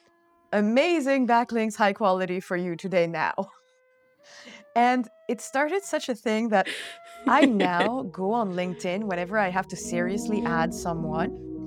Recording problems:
background music; noticeable; throughout; 10 dB below the speech

